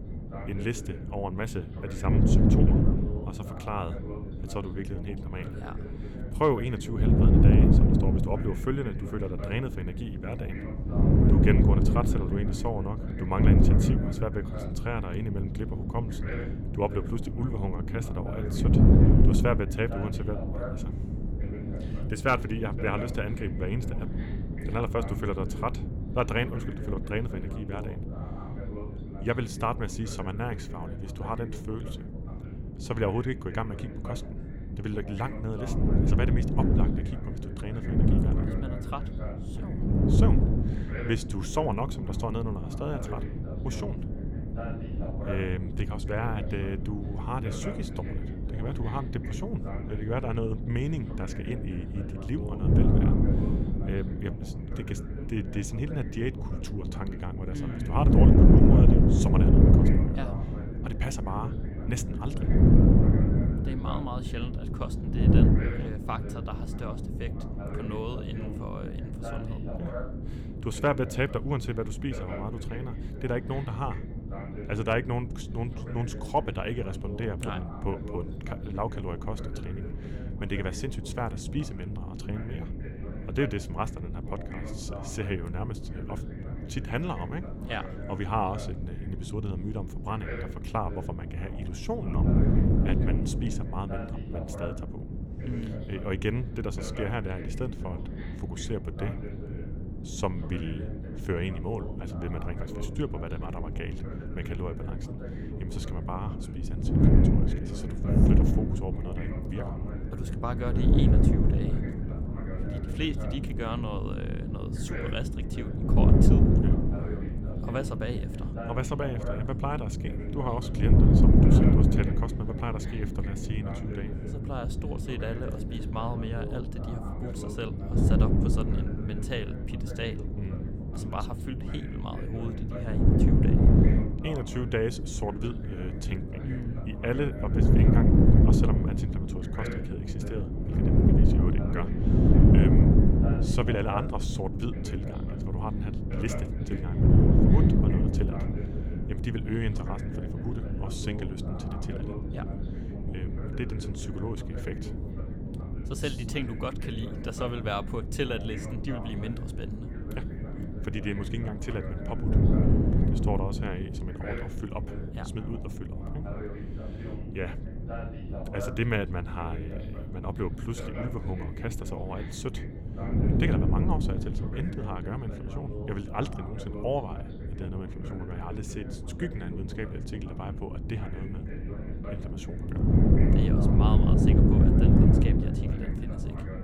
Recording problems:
wind noise on the microphone; heavy; 1 dB below the speech
voice in the background; noticeable; throughout; 10 dB below the speech

